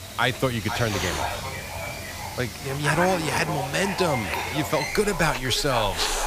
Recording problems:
echo of what is said; strong; throughout; 500 ms later, 8 dB below the speech
hiss; loud; throughout; 8 dB below the speech
animal sounds; noticeable; throughout; 10 dB below the speech

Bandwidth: 15 kHz